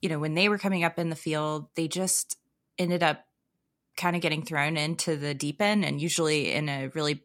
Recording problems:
none

